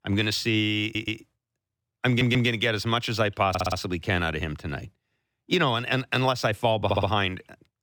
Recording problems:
audio stuttering; 4 times, first at 1 s

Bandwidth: 18 kHz